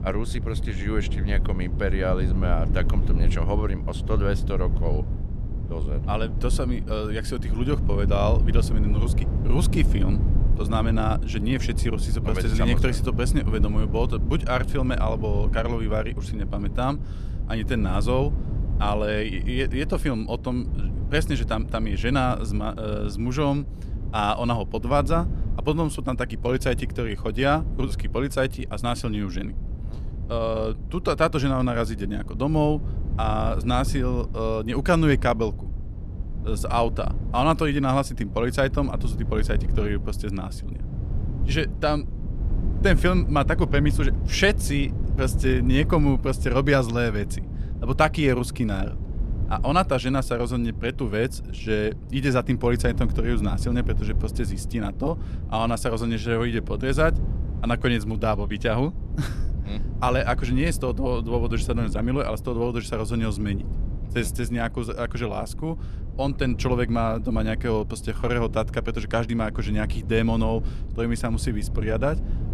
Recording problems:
low rumble; noticeable; throughout; 15 dB below the speech

